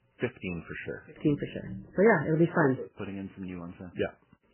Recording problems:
garbled, watery; badly; nothing above 3 kHz

